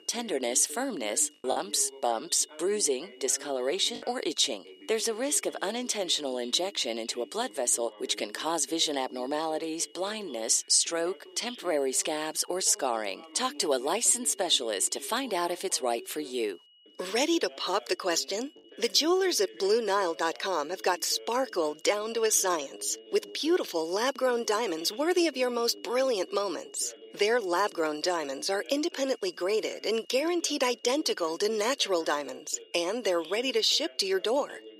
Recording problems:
thin; somewhat; fading below 350 Hz
high-pitched whine; faint; throughout; 3 kHz, 30 dB below the speech
voice in the background; faint; throughout; 20 dB below the speech
choppy; occasionally; from 1.5 to 4 s; 4% of the speech affected

